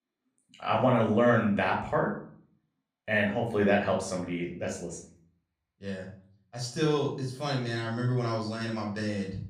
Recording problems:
off-mic speech; far
room echo; slight; dies away in 0.4 s

